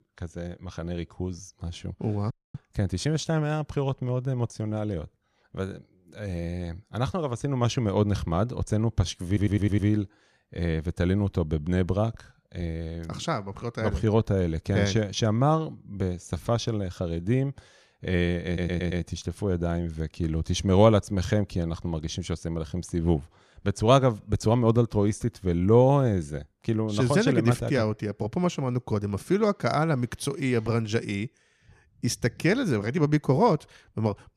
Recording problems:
audio cutting out; at 2.5 s
audio stuttering; at 9.5 s and at 18 s

